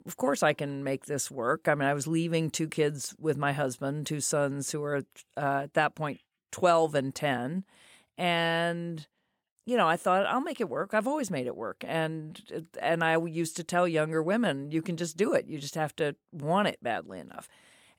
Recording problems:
none

